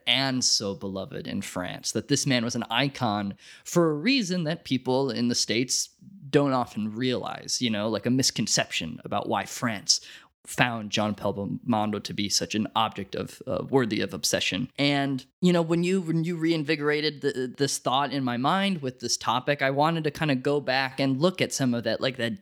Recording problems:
none

